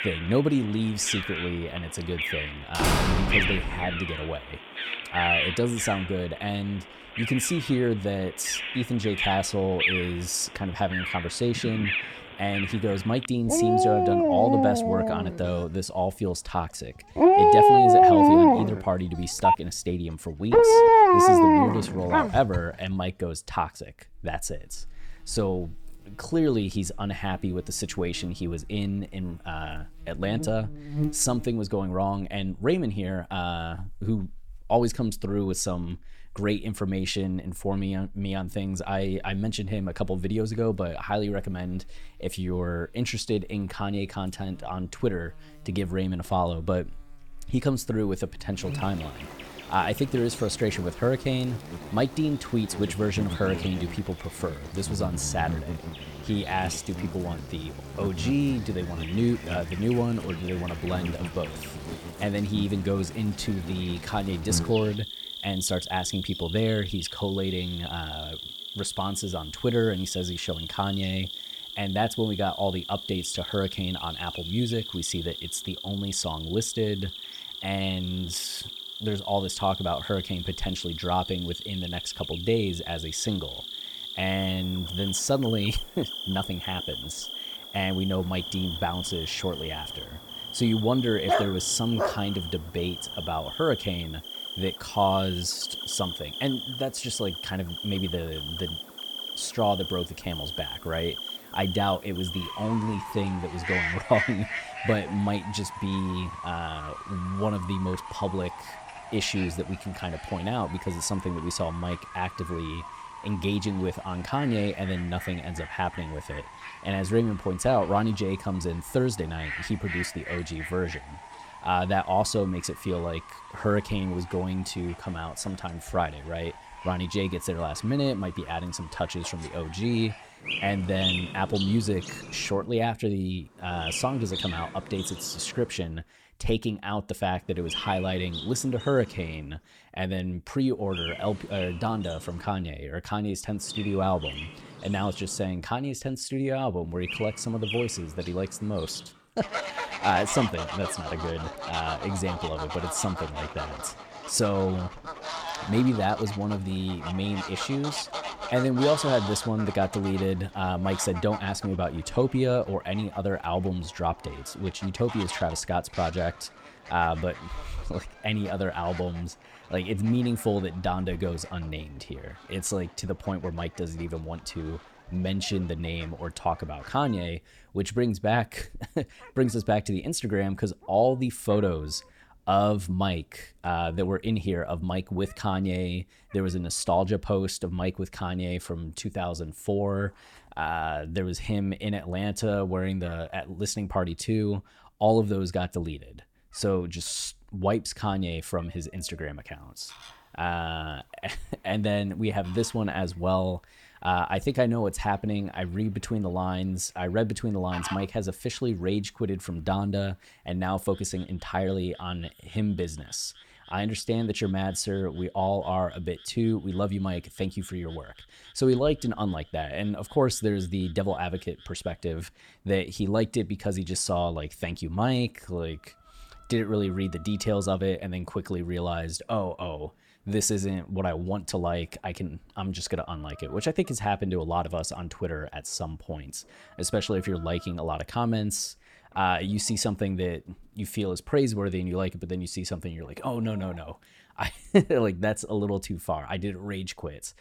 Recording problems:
animal sounds; loud; throughout; as loud as the speech
door banging; loud; from 3 to 4 s; peak 6 dB above the speech
phone ringing; loud; at 19 s; peak 6 dB above the speech
dog barking; loud; at 1:31; peak 3 dB above the speech

